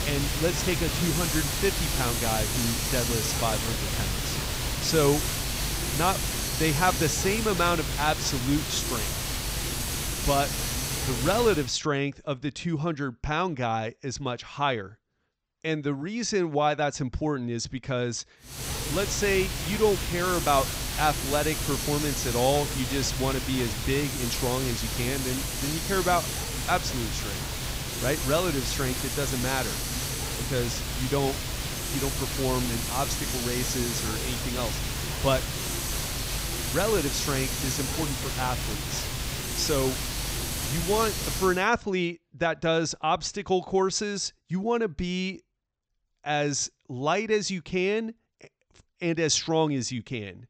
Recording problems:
high frequencies cut off; noticeable; nothing above 8 kHz
hiss; loud; until 12 s and from 19 to 42 s; 1 dB below the speech

